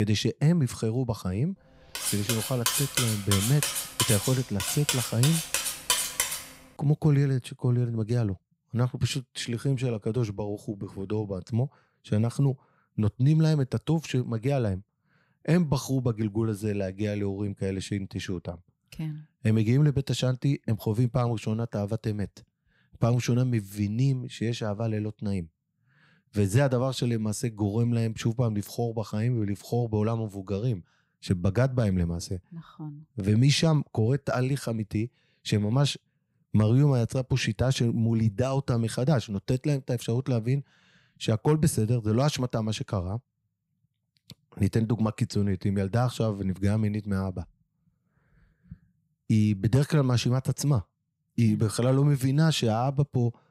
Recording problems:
abrupt cut into speech; at the start
clattering dishes; loud; from 2 to 6.5 s; peak 2 dB above the speech

